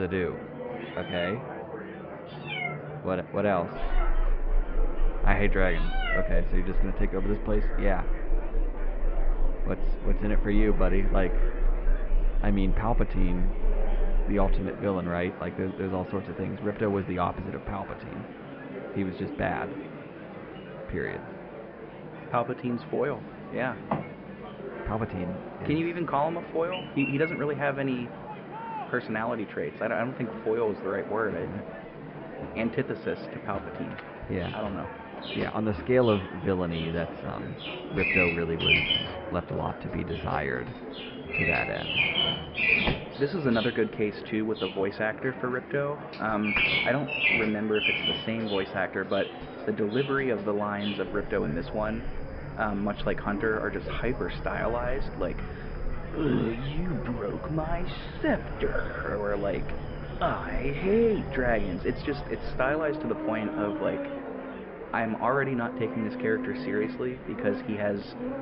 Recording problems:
high frequencies cut off; noticeable; nothing above 5.5 kHz
muffled; very slightly; fading above 2.5 kHz
animal sounds; loud; throughout; 2 dB below the speech
murmuring crowd; noticeable; throughout; 10 dB below the speech
abrupt cut into speech; at the start

